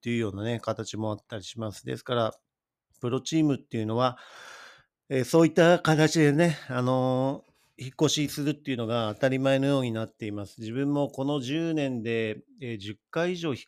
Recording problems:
none

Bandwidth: 14.5 kHz